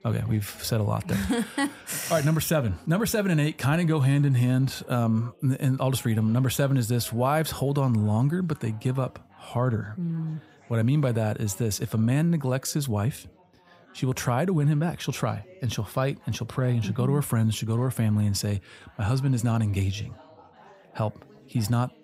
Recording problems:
background chatter; faint; throughout; 4 voices, 25 dB below the speech

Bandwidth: 15.5 kHz